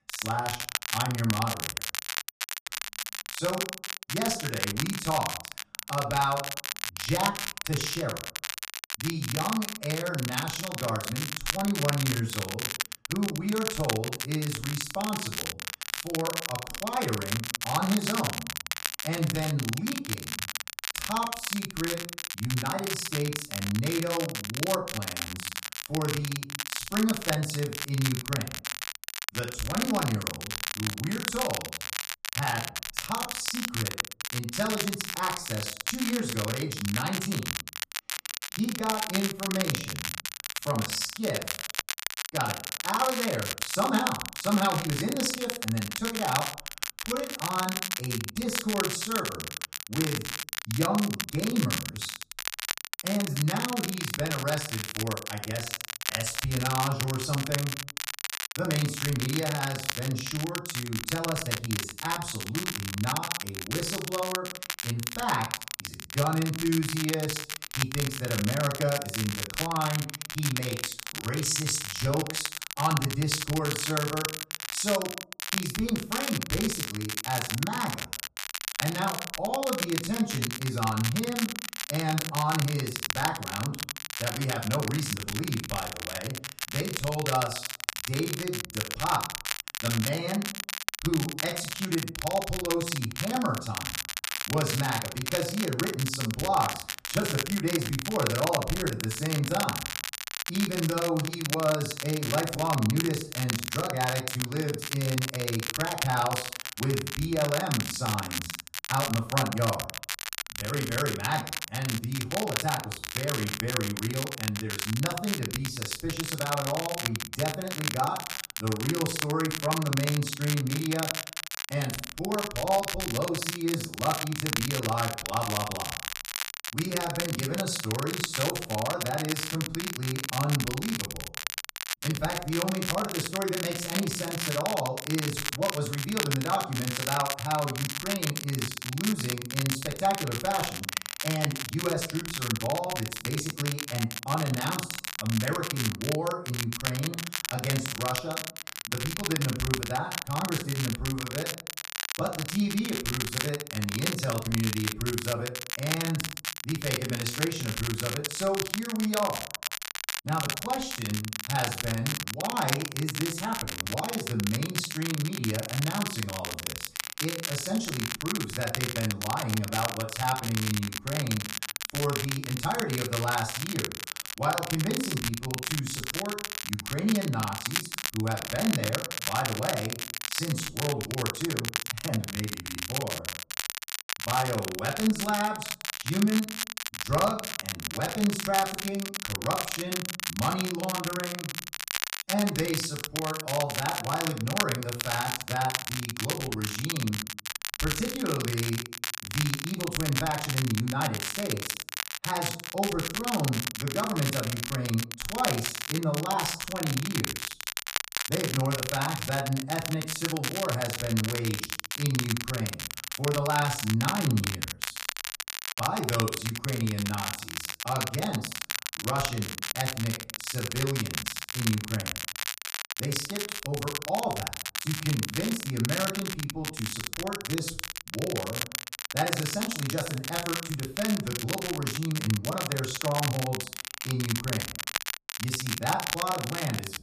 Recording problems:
off-mic speech; far
room echo; slight; dies away in 0.4 s
crackle, like an old record; loud; 2 dB below the speech

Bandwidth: 14.5 kHz